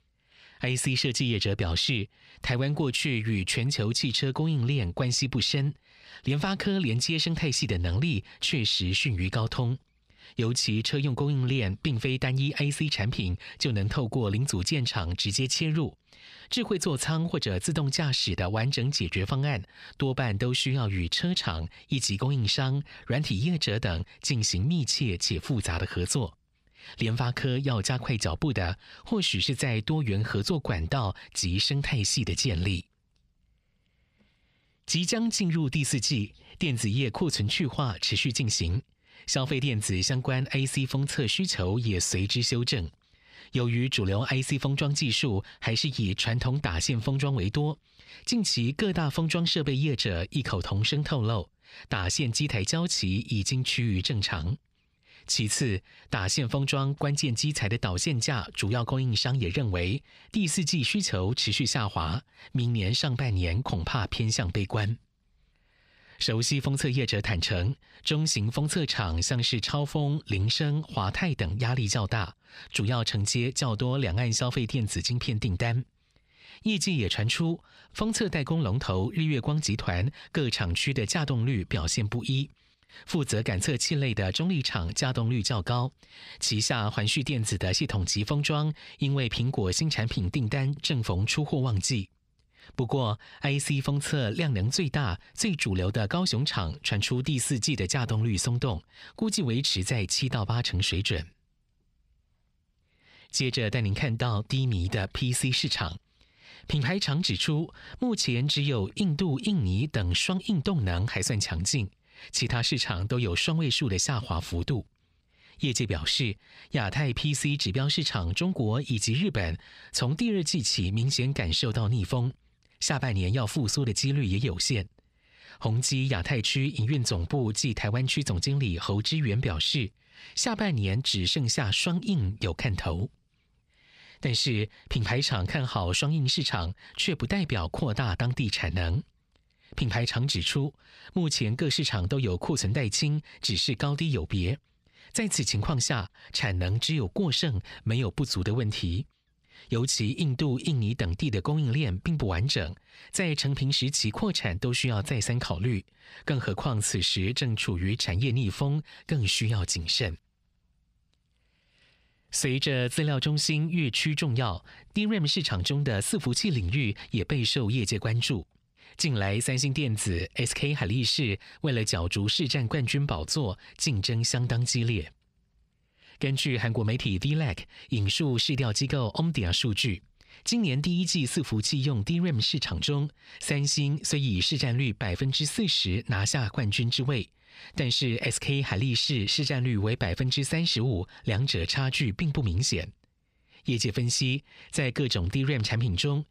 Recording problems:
squashed, flat; somewhat

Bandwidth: 14.5 kHz